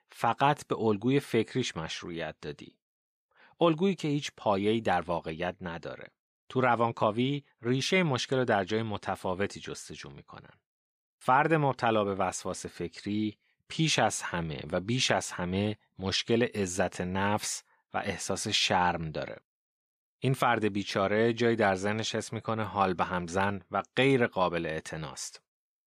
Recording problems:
none

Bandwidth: 14.5 kHz